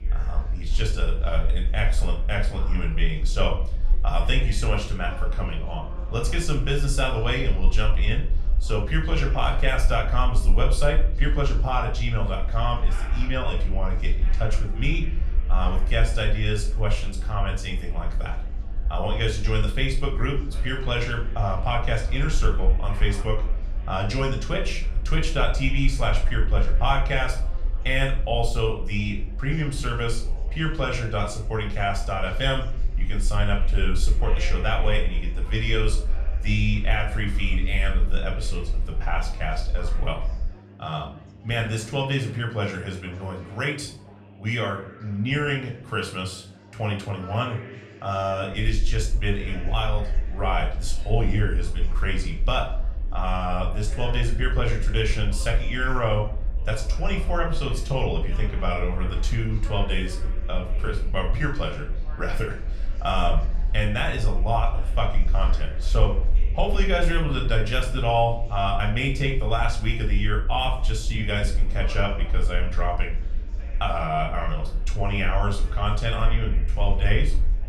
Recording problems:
room echo; slight; dies away in 0.4 s
off-mic speech; somewhat distant
chatter from many people; noticeable; throughout; 20 dB below the speech
electrical hum; faint; throughout; 50 Hz, 30 dB below the speech
low rumble; faint; until 41 s and from 49 s on; 25 dB below the speech

